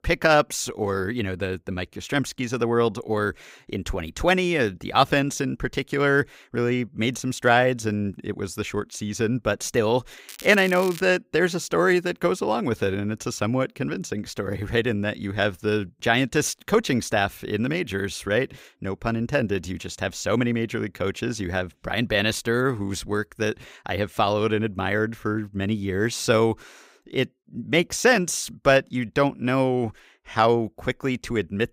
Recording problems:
crackling; noticeable; at 10 s; 15 dB below the speech

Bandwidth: 15.5 kHz